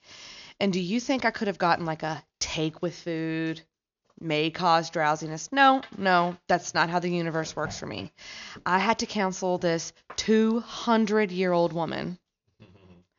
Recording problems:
high frequencies cut off; noticeable; nothing above 7 kHz

